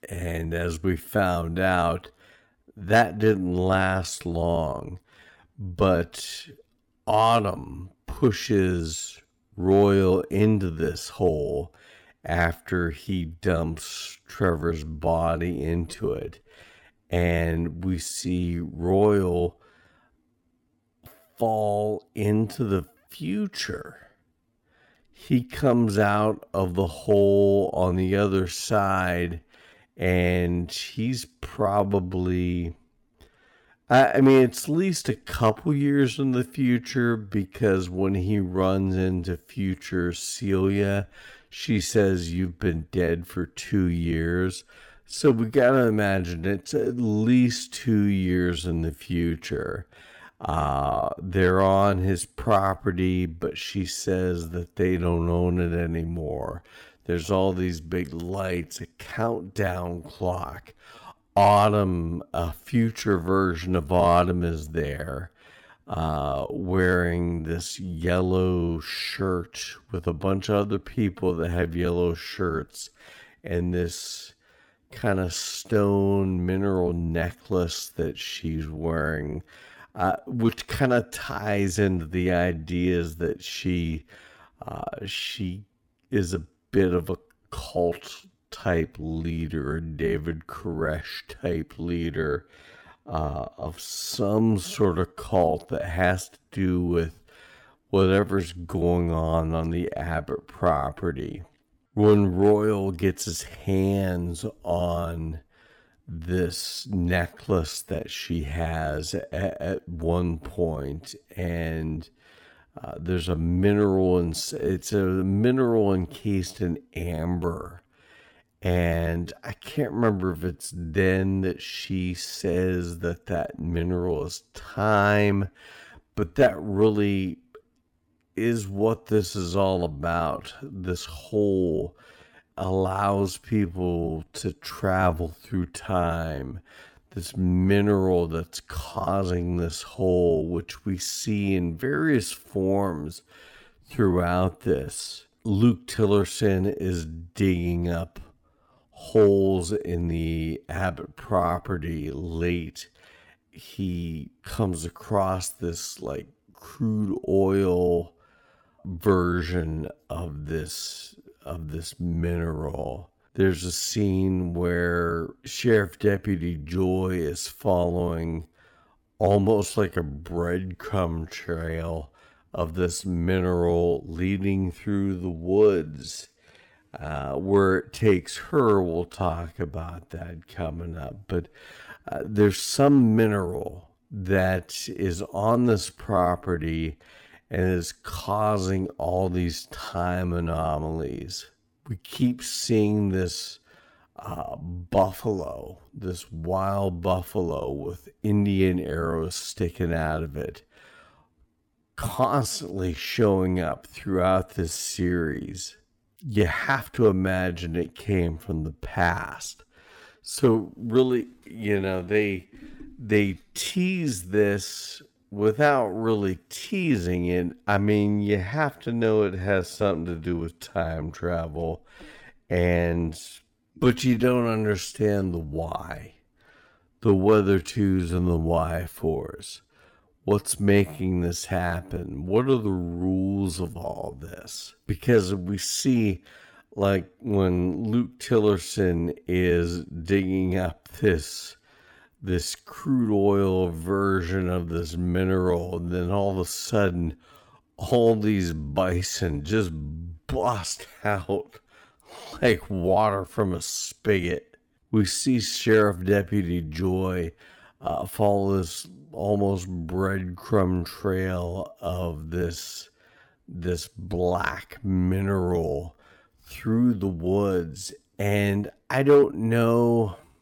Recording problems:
wrong speed, natural pitch; too slow; 0.6 times normal speed

